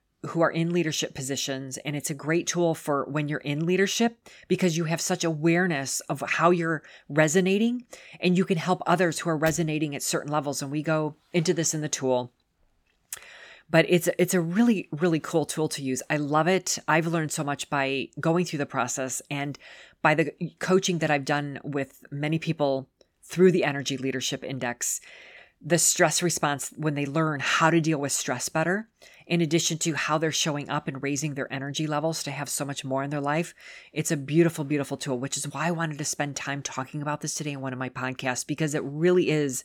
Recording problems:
none

